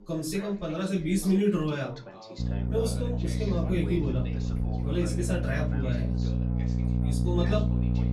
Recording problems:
off-mic speech; far
room echo; slight; dies away in 0.3 s
electrical hum; loud; from 2.5 s on; 60 Hz, 6 dB below the speech
background chatter; noticeable; throughout; 3 voices, 15 dB below the speech

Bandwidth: 15.5 kHz